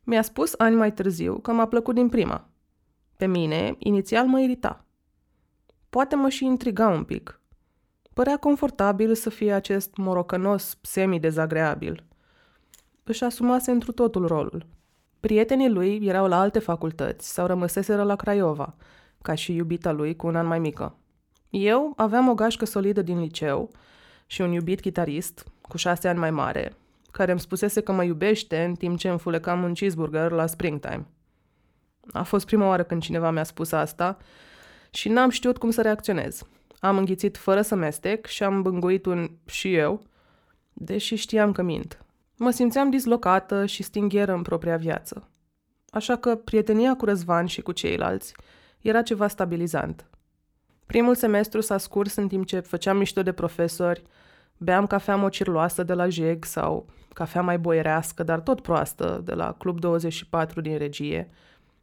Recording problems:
none

